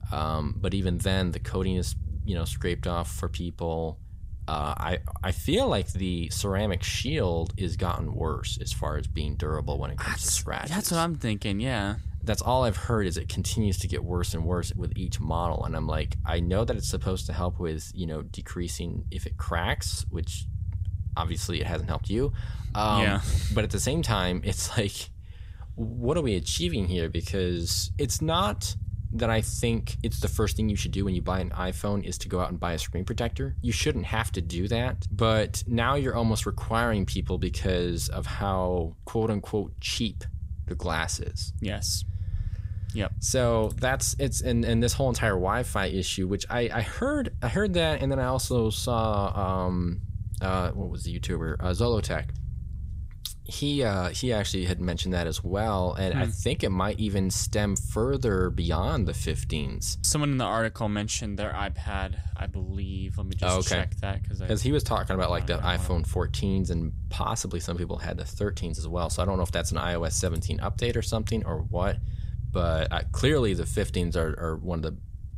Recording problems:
low rumble; faint; throughout; 20 dB below the speech

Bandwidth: 15.5 kHz